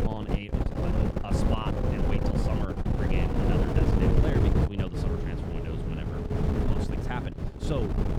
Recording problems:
wind noise on the microphone; heavy; 5 dB above the speech

